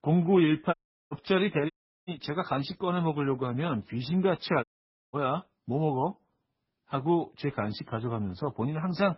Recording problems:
garbled, watery; badly; nothing above 5.5 kHz
audio cutting out; at 0.5 s, at 1.5 s and at 4.5 s

